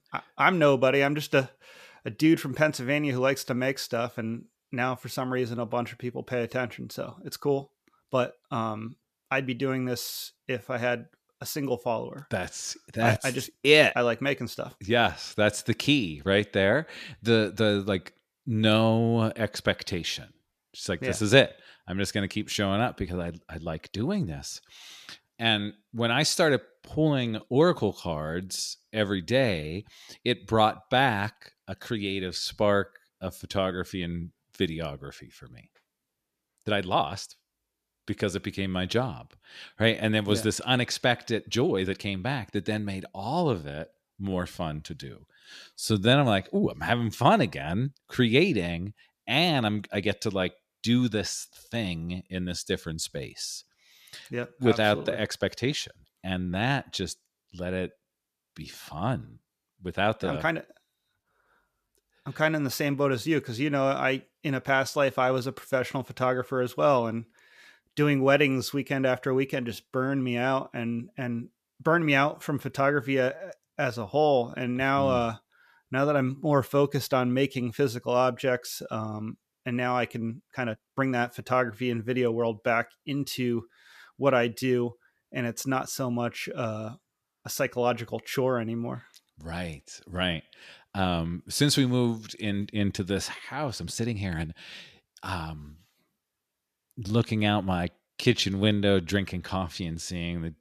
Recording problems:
uneven, jittery; strongly; from 27 s to 1:39

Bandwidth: 14.5 kHz